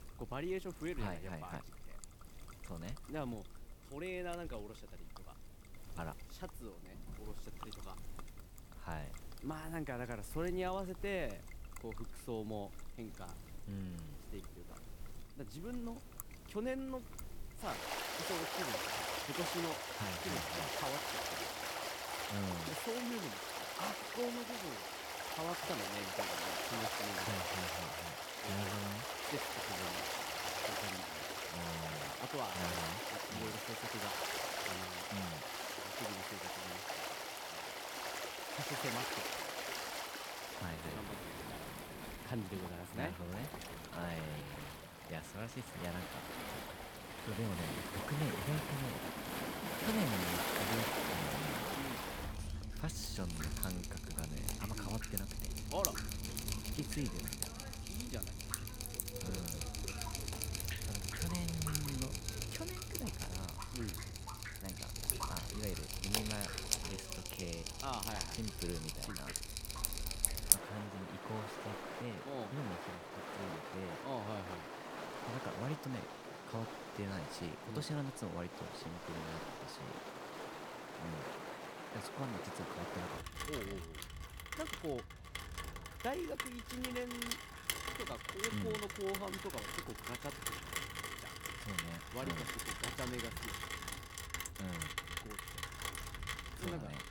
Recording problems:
rain or running water; very loud; throughout; 4 dB above the speech

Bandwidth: 18 kHz